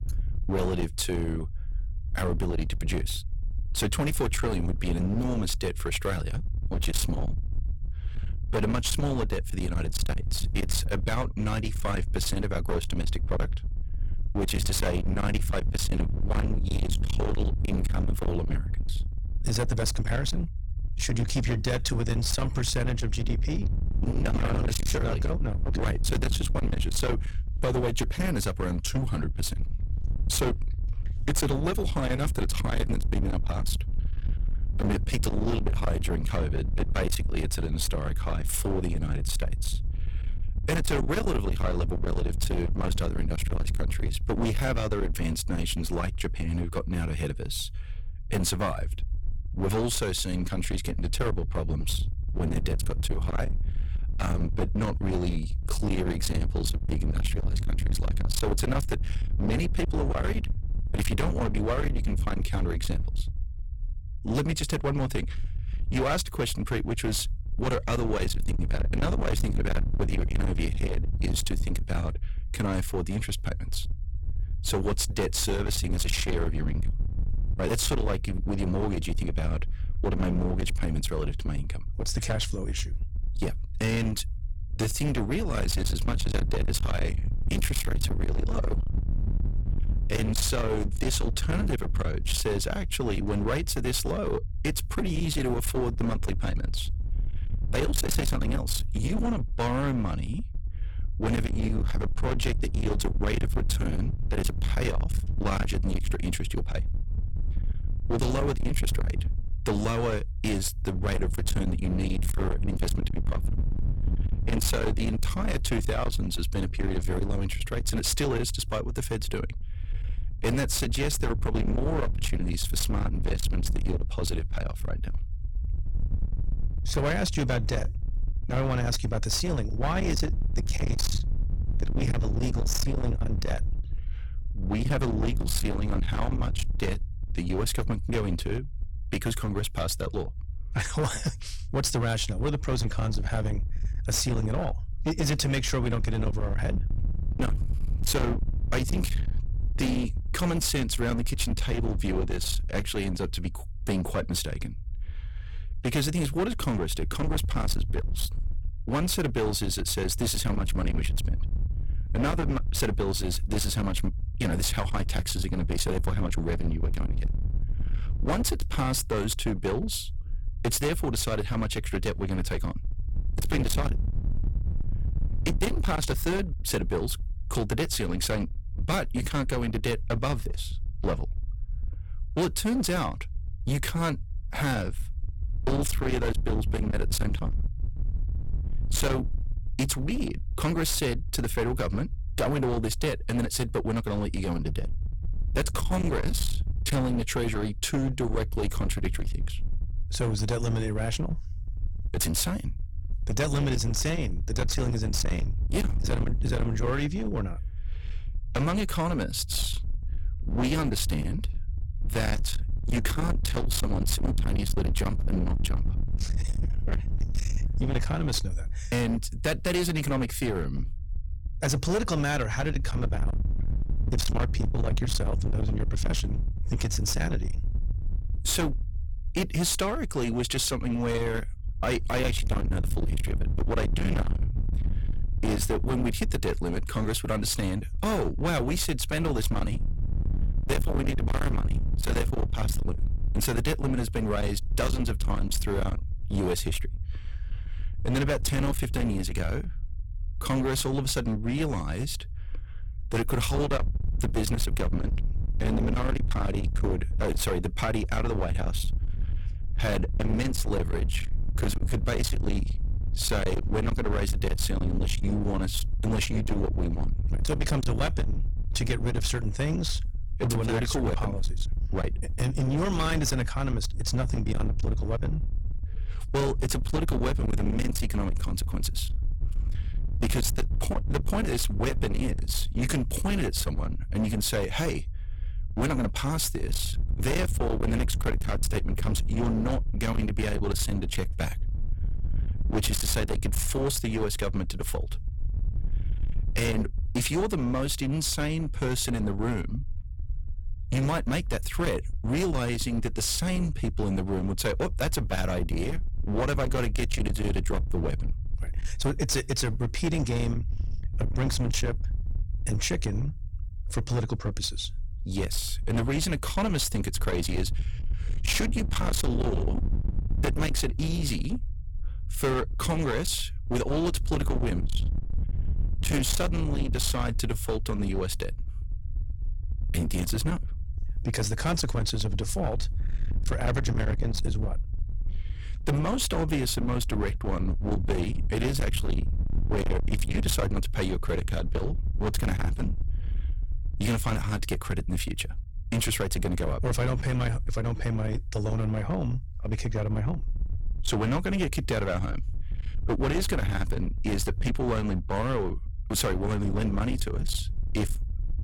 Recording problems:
distortion; heavy; 28% of the sound clipped
low rumble; noticeable; throughout; 10 dB below the speech

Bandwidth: 17 kHz